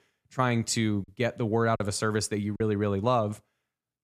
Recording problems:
choppy; very; at 1 s and at 2 s; 7% of the speech affected

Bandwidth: 14.5 kHz